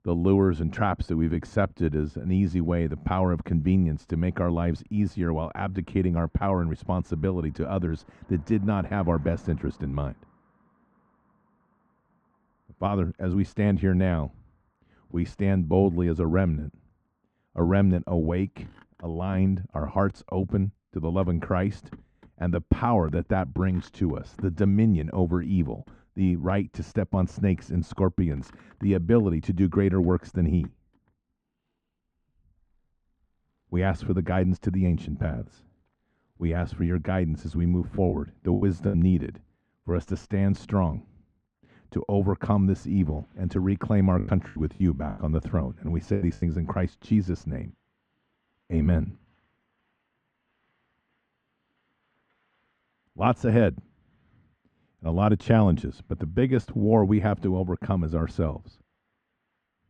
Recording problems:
muffled; very; fading above 1.5 kHz
traffic noise; faint; throughout; 30 dB below the speech
choppy; very; at 38 s and from 44 to 46 s; 12% of the speech affected

